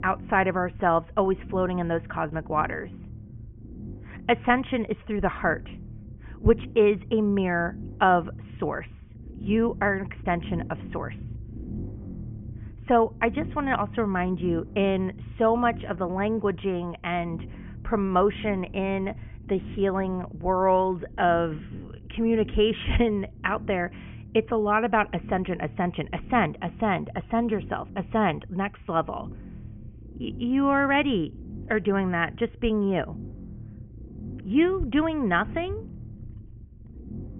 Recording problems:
high frequencies cut off; severe; nothing above 3 kHz
low rumble; faint; throughout; 25 dB below the speech

